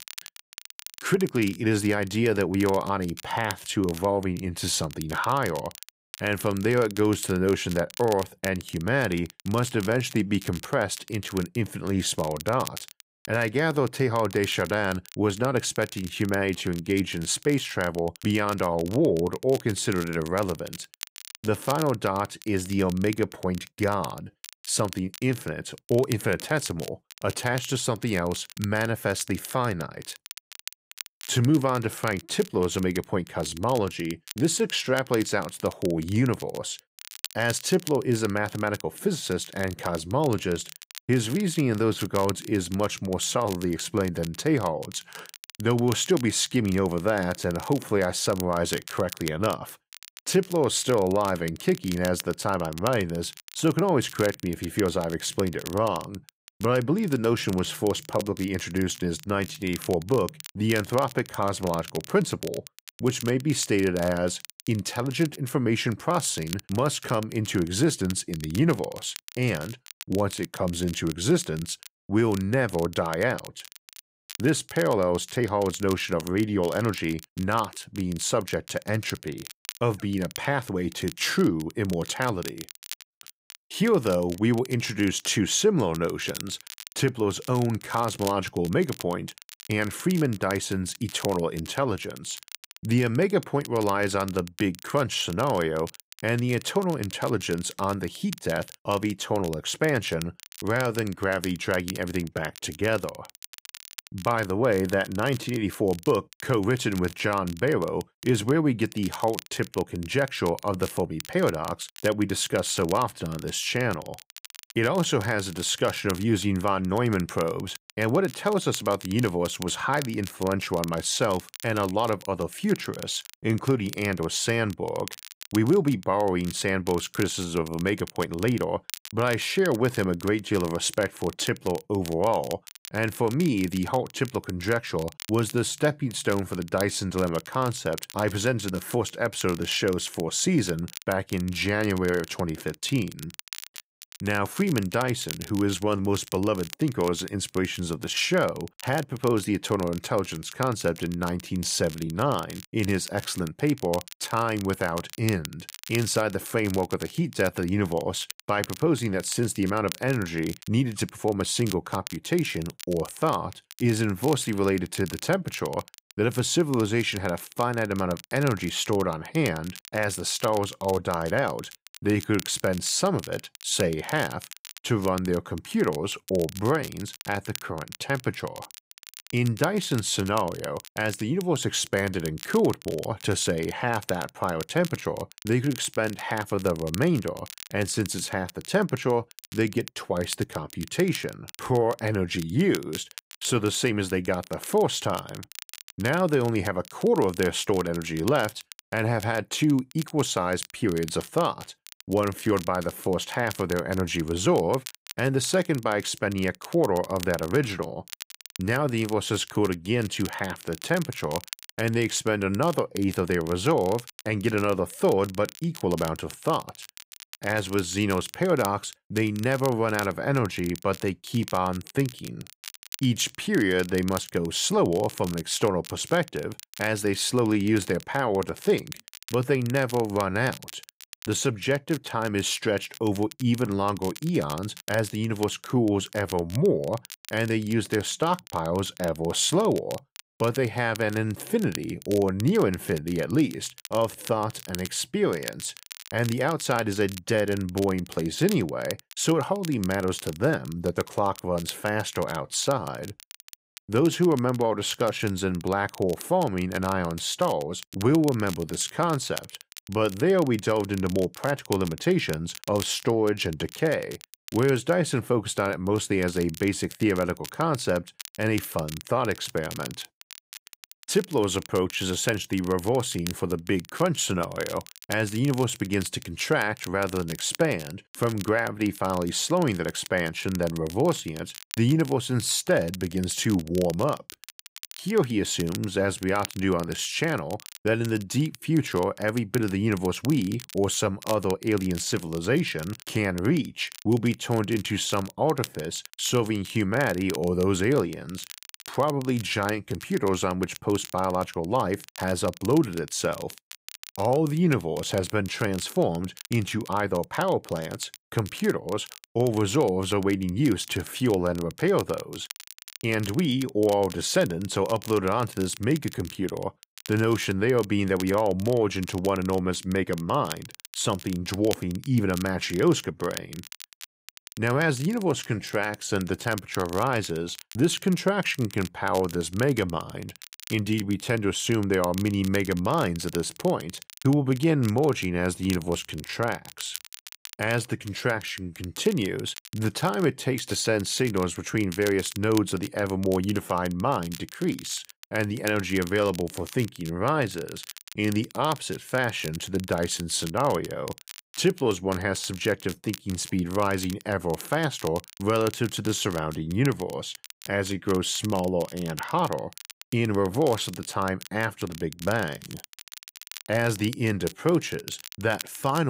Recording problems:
crackle, like an old record; noticeable; 15 dB below the speech
abrupt cut into speech; at the end

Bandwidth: 15.5 kHz